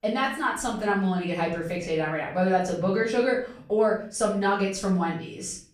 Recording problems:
off-mic speech; far
room echo; noticeable; dies away in 0.5 s

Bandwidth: 14.5 kHz